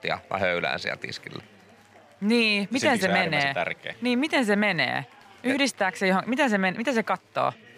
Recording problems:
chatter from many people; faint; throughout; 25 dB below the speech

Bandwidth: 15 kHz